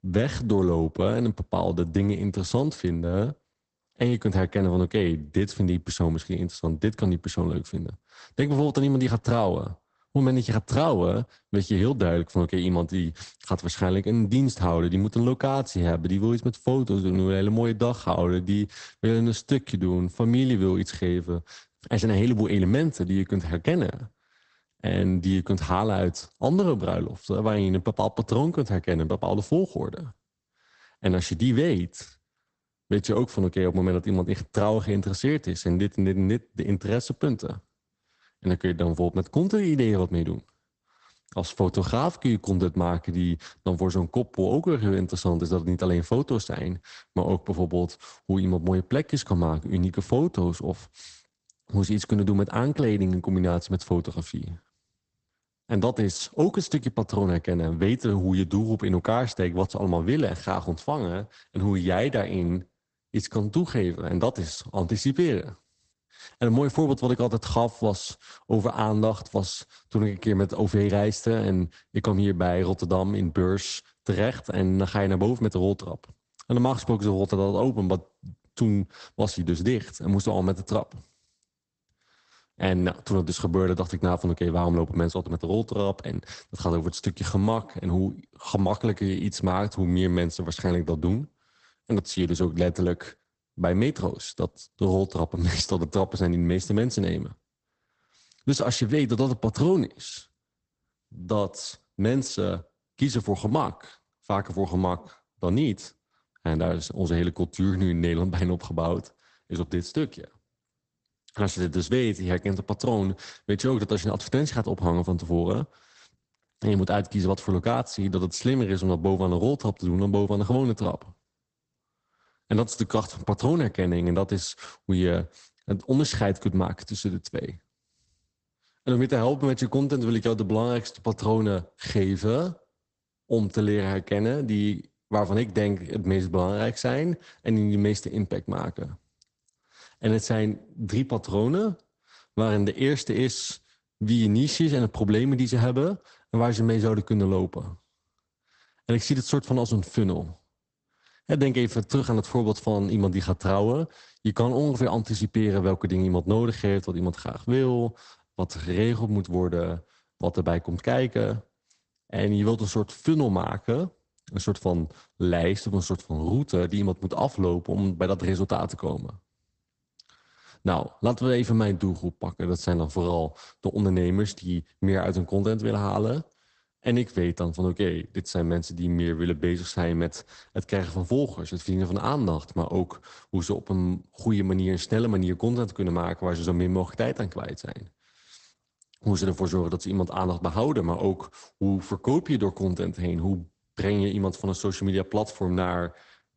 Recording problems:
garbled, watery; badly; nothing above 8 kHz

